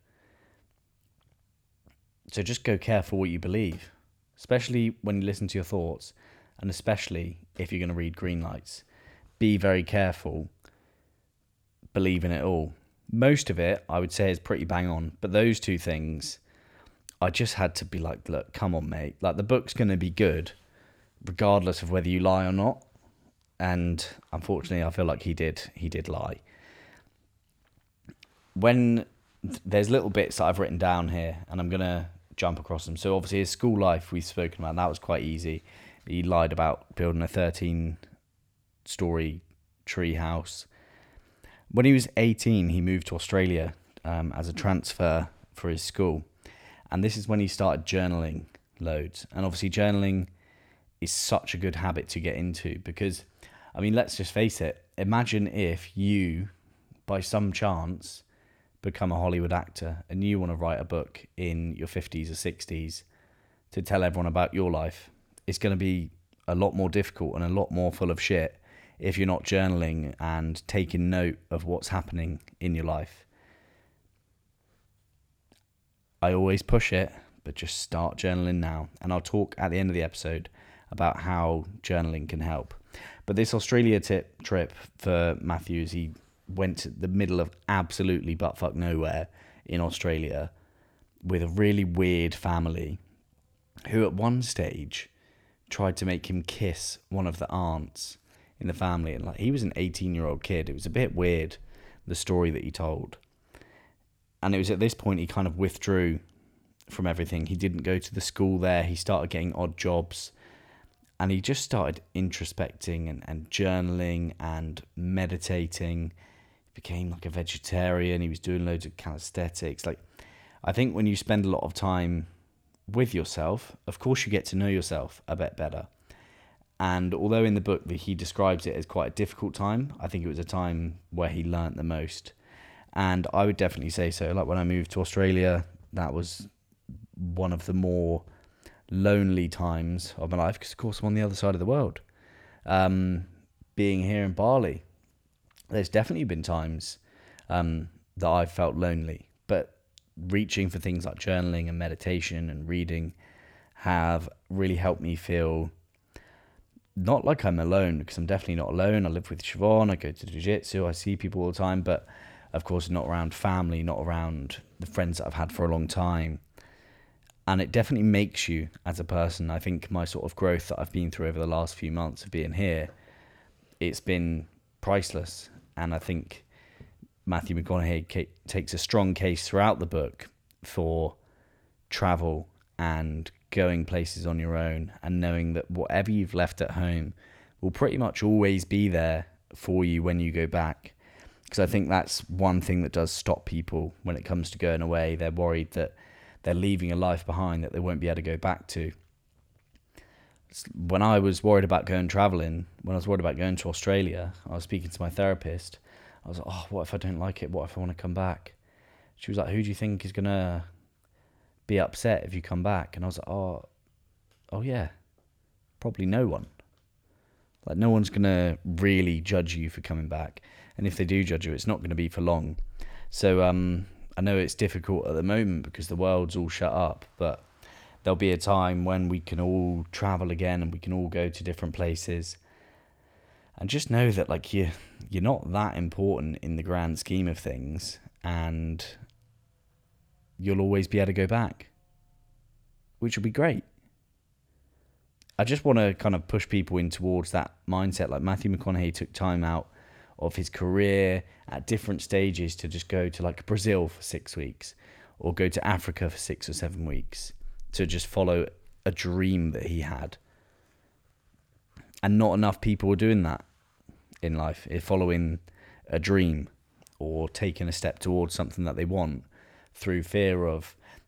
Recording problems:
none

